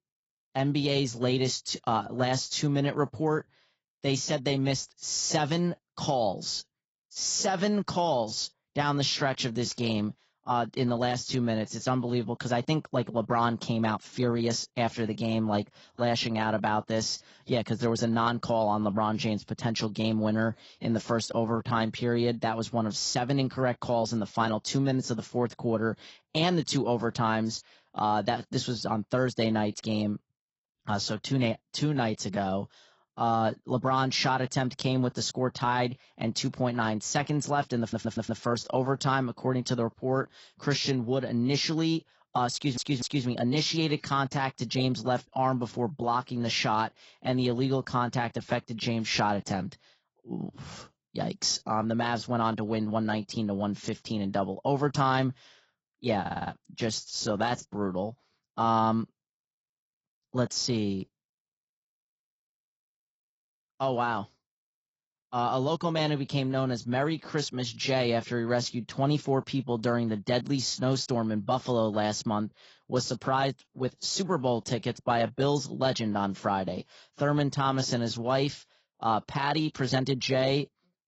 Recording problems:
garbled, watery; badly; nothing above 7.5 kHz
audio stuttering; at 38 s, at 43 s and at 56 s

